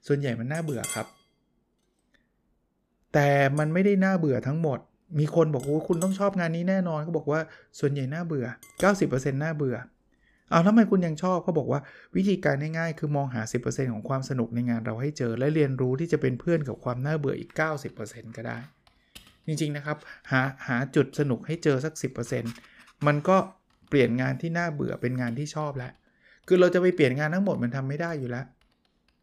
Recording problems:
household noises; noticeable; throughout; 15 dB below the speech

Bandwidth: 14.5 kHz